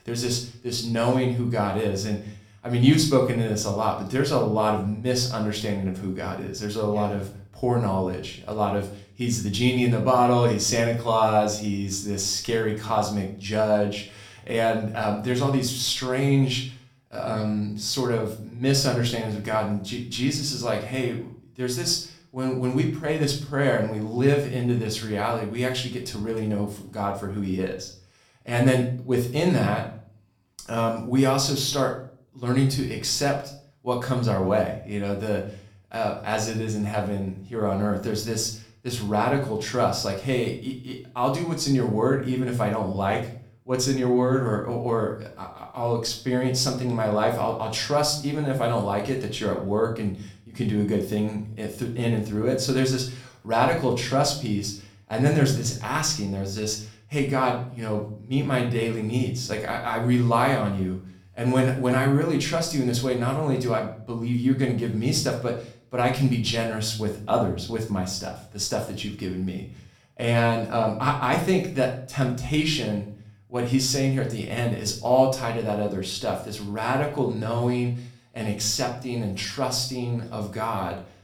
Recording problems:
room echo; slight; dies away in 0.4 s
off-mic speech; somewhat distant

